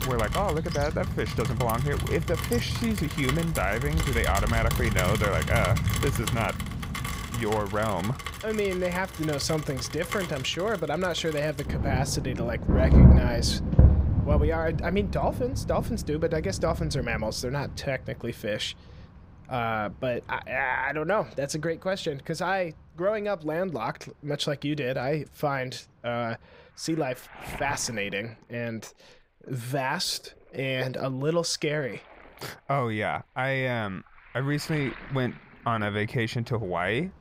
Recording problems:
rain or running water; very loud; throughout; 1 dB above the speech

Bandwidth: 15.5 kHz